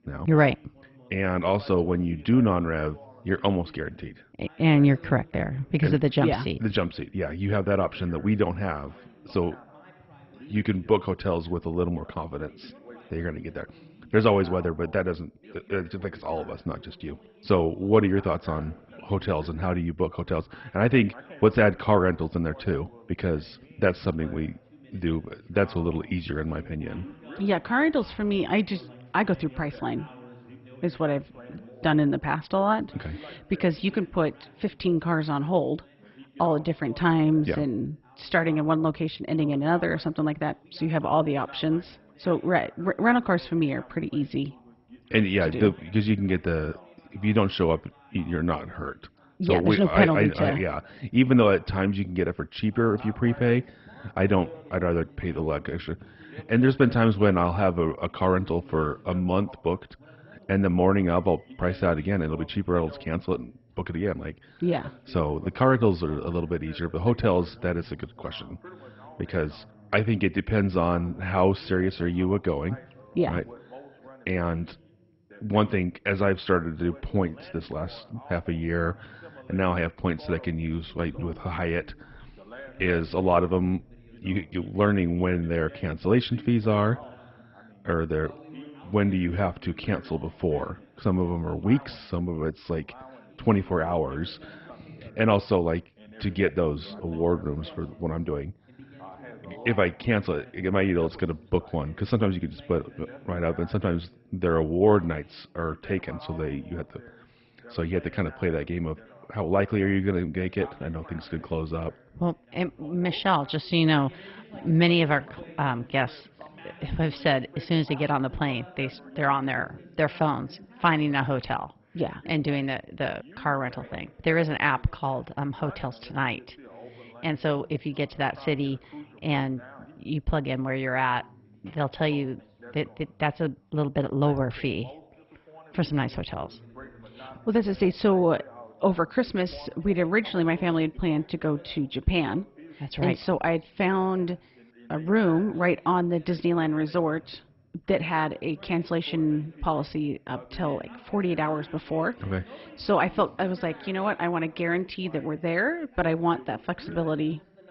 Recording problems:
garbled, watery; badly; nothing above 5.5 kHz
muffled; very slightly; fading above 3.5 kHz
background chatter; faint; throughout; 2 voices, 20 dB below the speech

